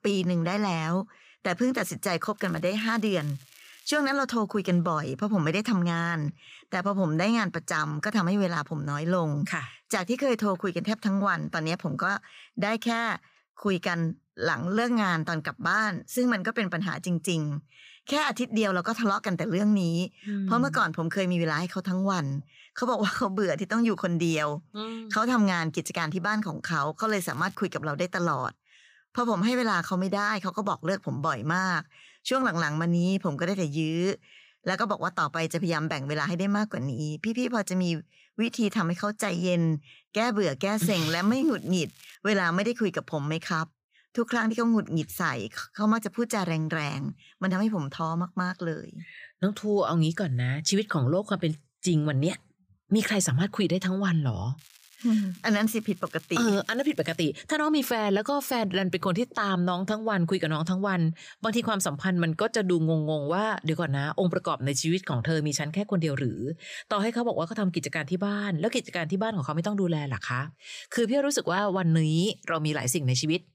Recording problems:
crackling; faint; 4 times, first at 2.5 s; 25 dB below the speech

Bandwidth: 15 kHz